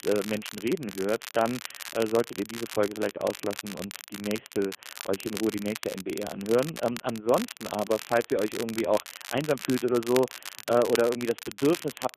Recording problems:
phone-call audio; poor line
crackle, like an old record; noticeable; 10 dB below the speech

